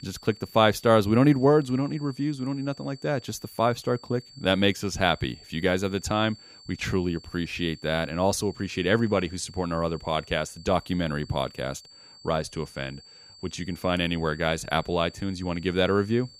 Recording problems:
high-pitched whine; faint; throughout; 4.5 kHz, 20 dB below the speech

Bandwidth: 15.5 kHz